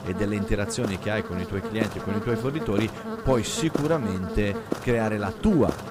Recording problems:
electrical hum; loud; throughout; 60 Hz, 5 dB below the speech

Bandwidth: 15.5 kHz